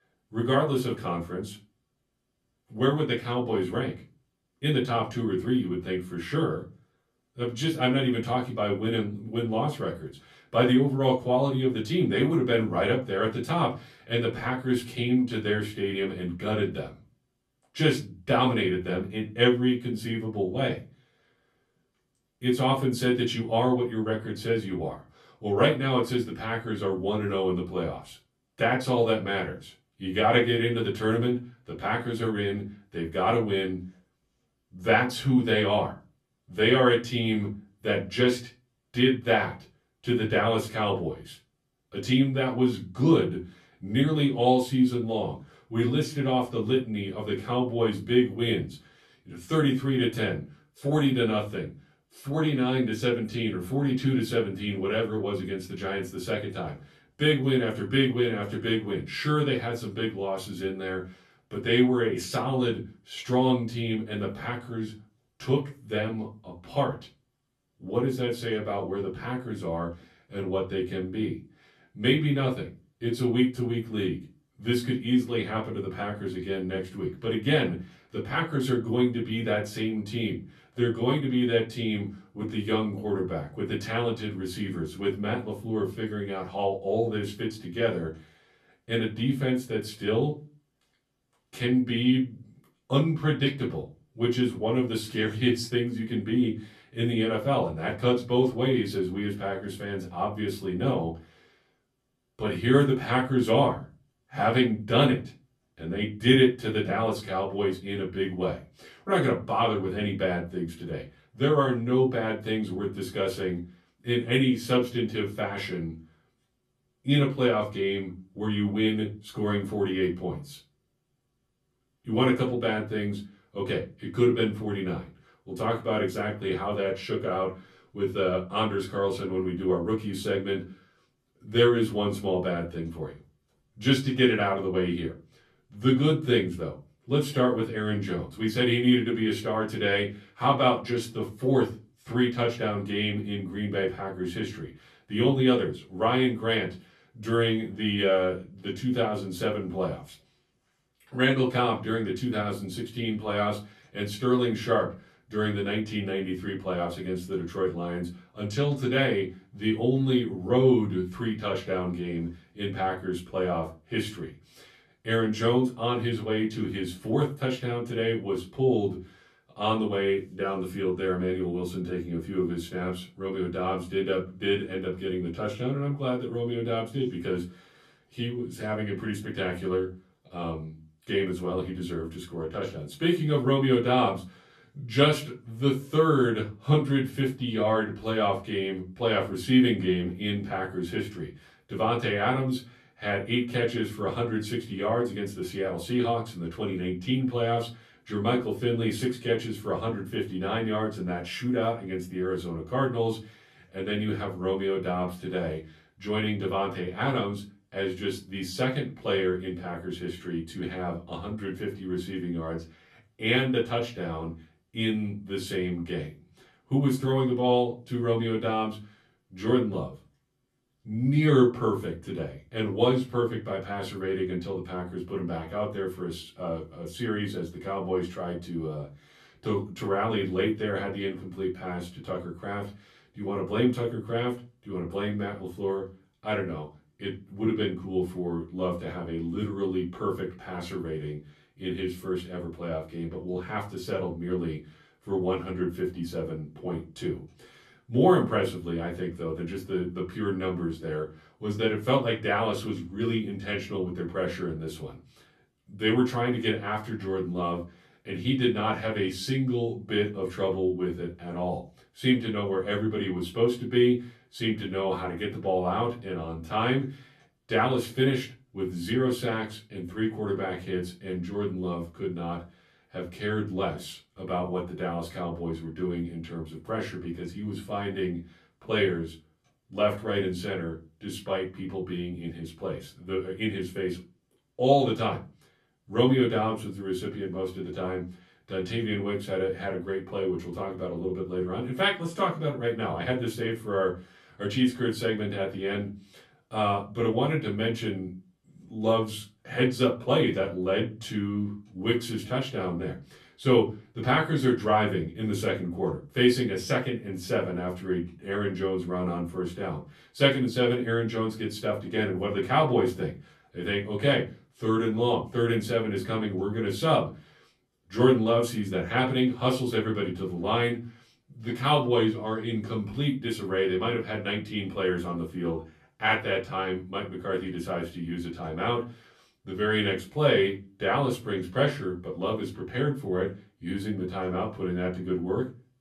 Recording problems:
off-mic speech; far
room echo; very slight; dies away in 0.3 s

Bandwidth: 13.5 kHz